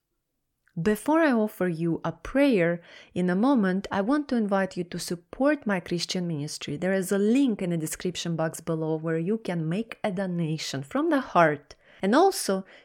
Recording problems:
none

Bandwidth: 17 kHz